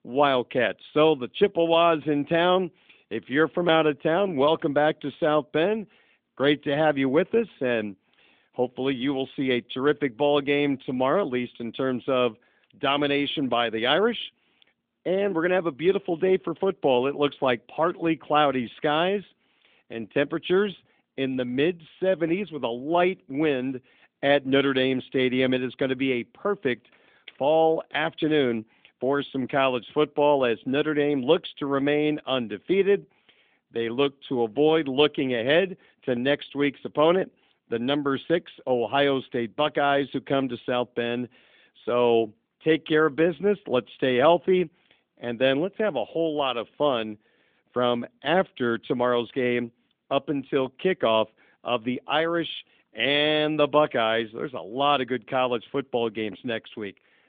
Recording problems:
phone-call audio; nothing above 3.5 kHz

